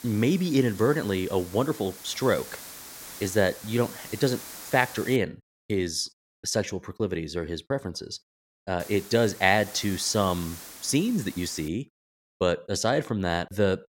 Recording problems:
hiss; noticeable; until 5 s and from 9 to 12 s; 15 dB below the speech

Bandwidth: 16.5 kHz